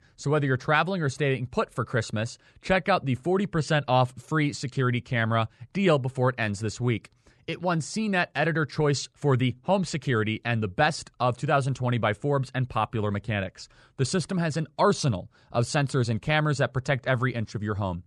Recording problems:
none

